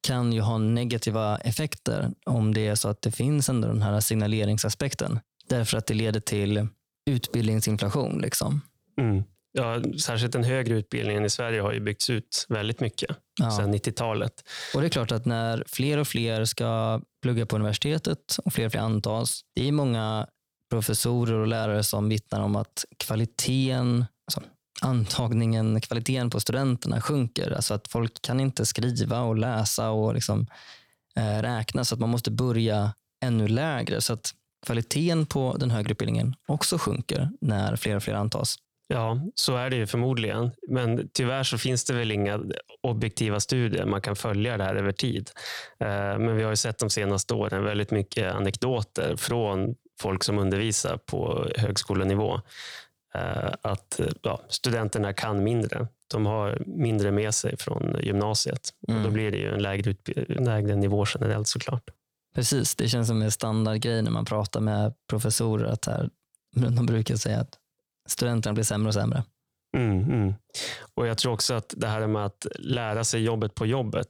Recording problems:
squashed, flat; somewhat

